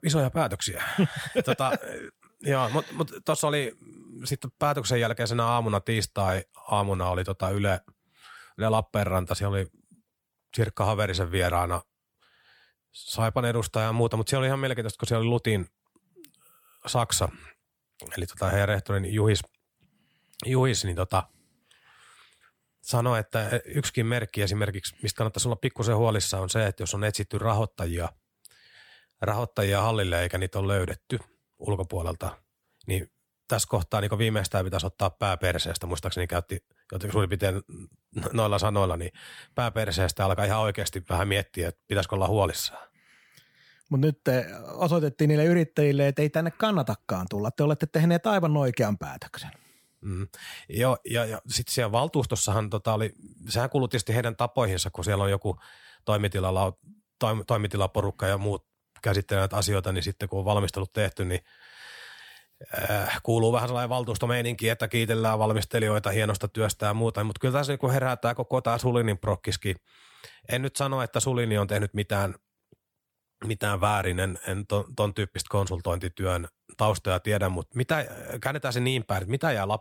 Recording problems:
none

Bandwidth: 18.5 kHz